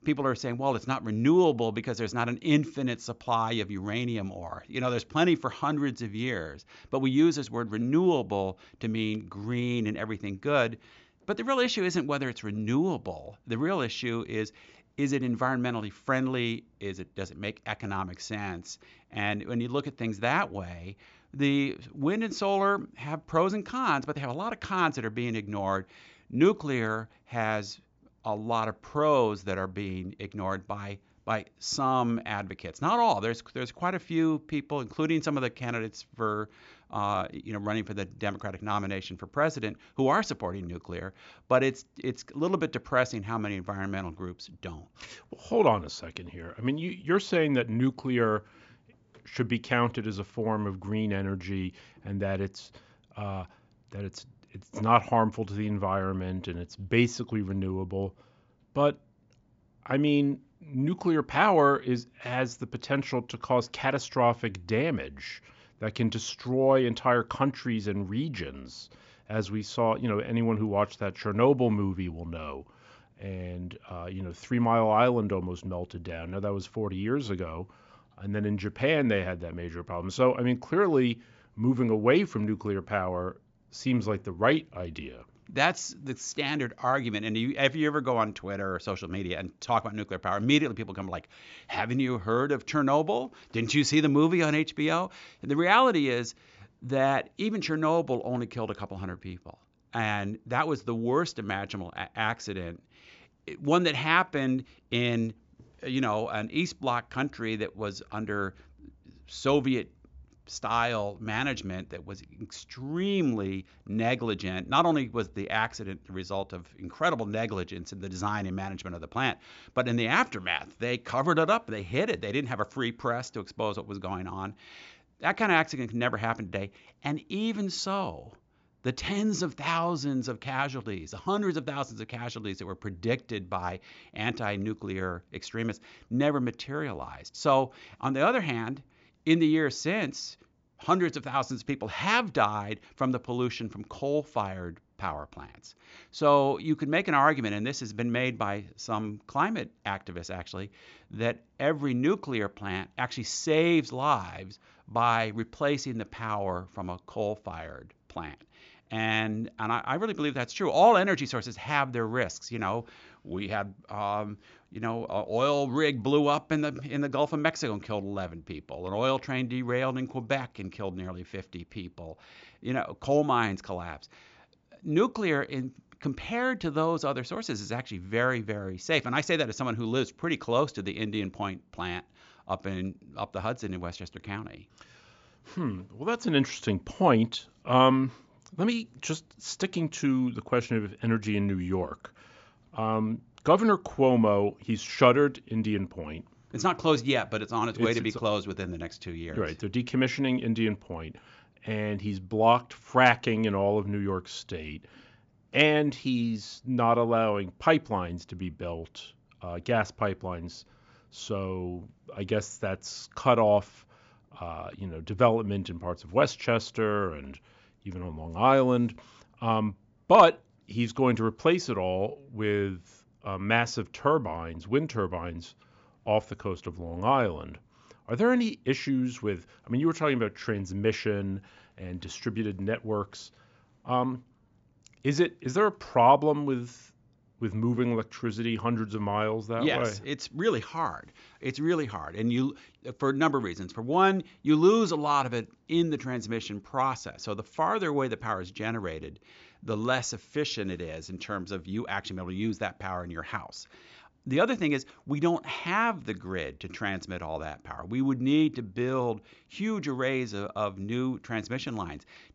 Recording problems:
high frequencies cut off; noticeable; nothing above 7.5 kHz

